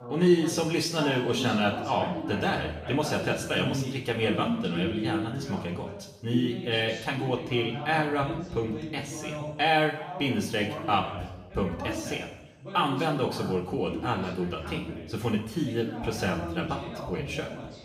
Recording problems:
room echo; noticeable; dies away in 0.9 s
off-mic speech; somewhat distant
voice in the background; loud; throughout; 8 dB below the speech

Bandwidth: 15.5 kHz